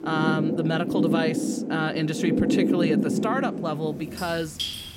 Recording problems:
rain or running water; very loud; throughout; 2 dB above the speech

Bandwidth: 16 kHz